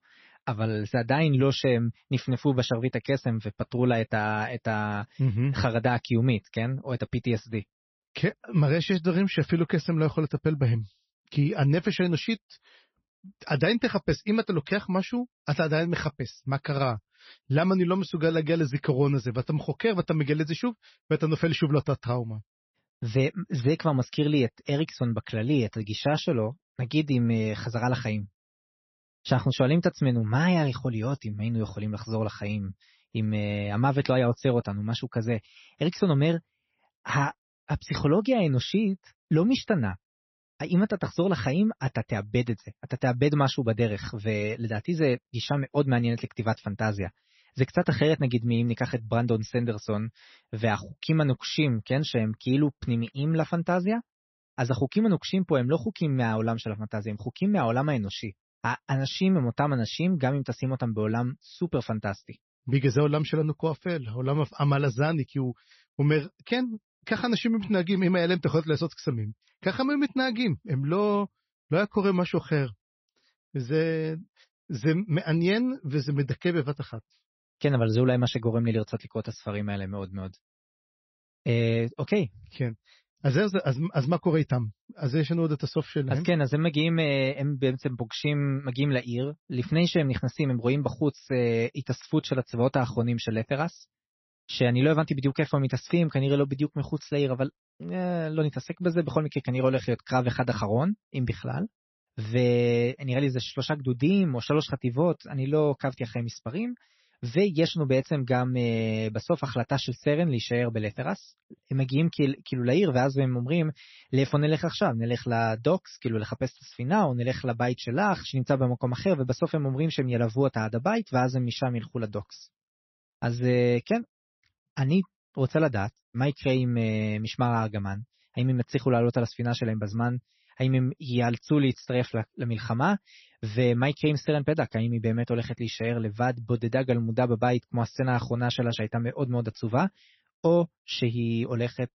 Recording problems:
garbled, watery; slightly; nothing above 6 kHz

